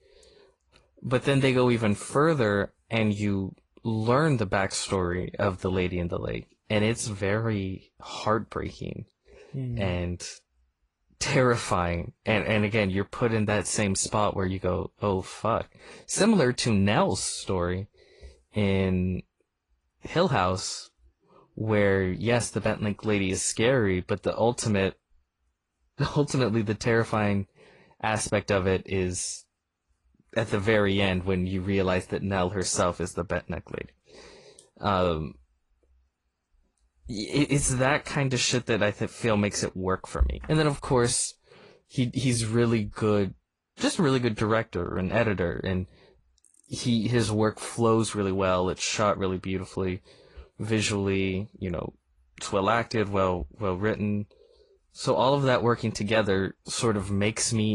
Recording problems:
garbled, watery; slightly
abrupt cut into speech; at the end

